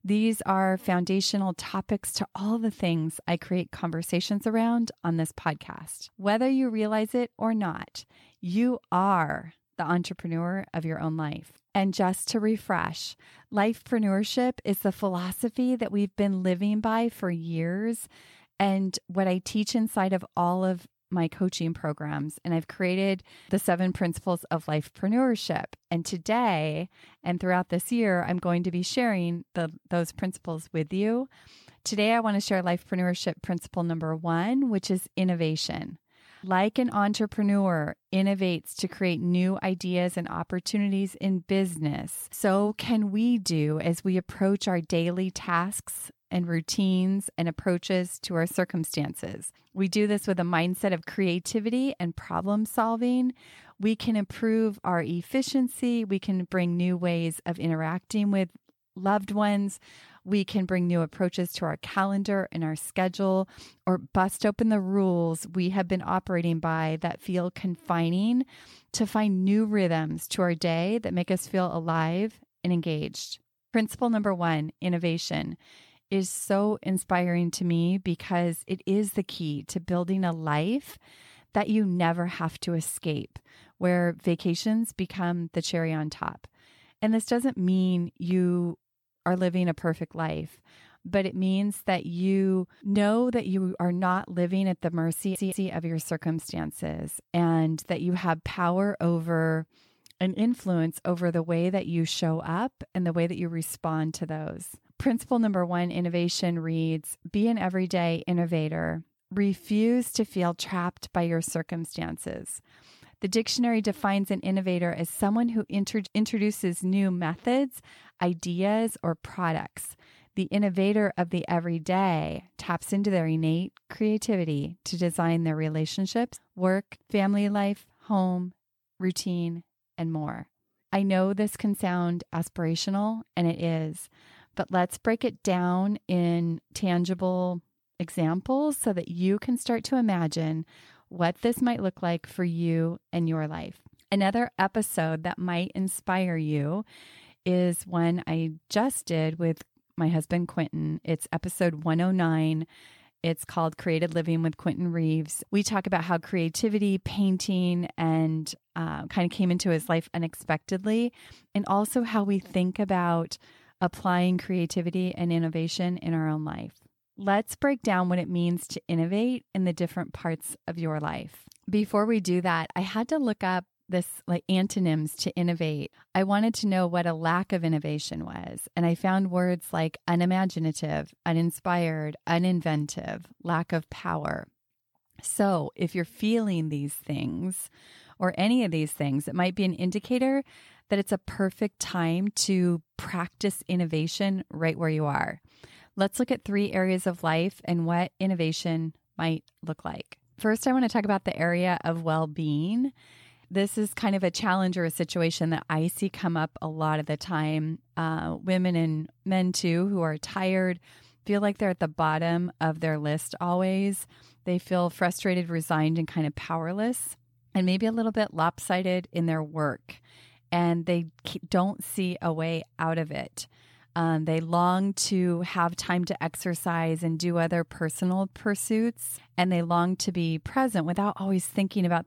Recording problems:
audio stuttering; at 1:35

